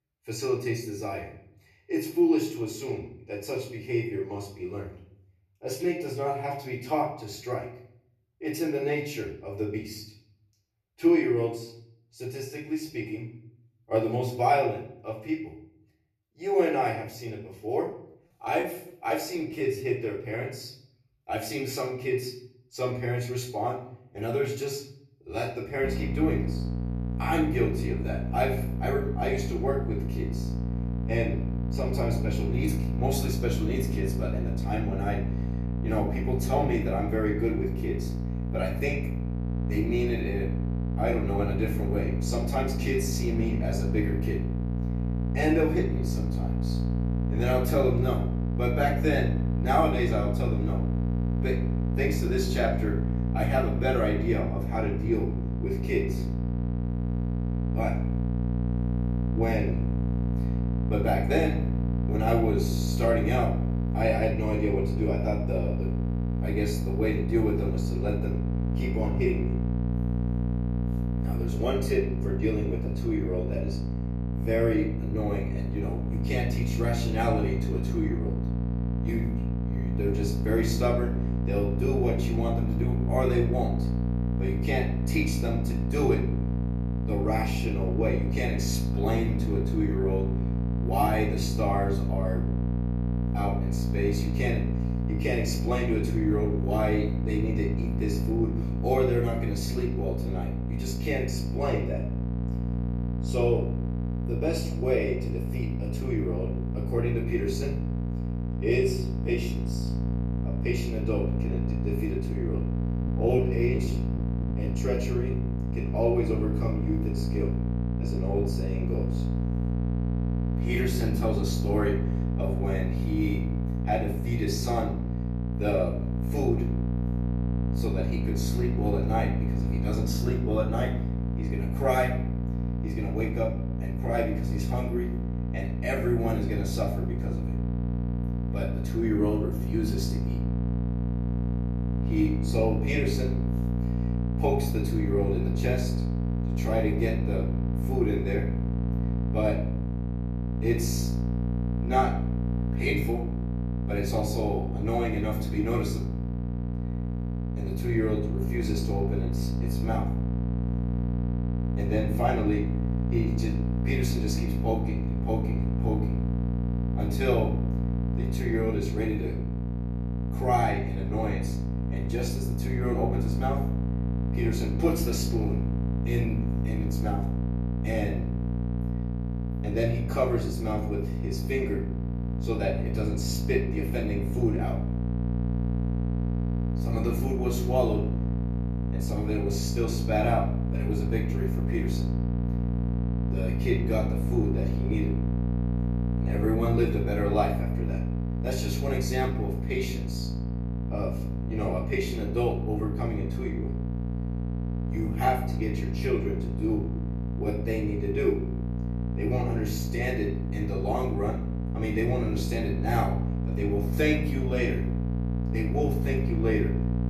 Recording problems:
off-mic speech; far
room echo; slight; dies away in 0.5 s
electrical hum; loud; from 26 s on; 60 Hz, 7 dB below the speech
choppy; very; from 18 to 20 s and from 1:53 to 1:56; 7% of the speech affected

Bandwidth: 13.5 kHz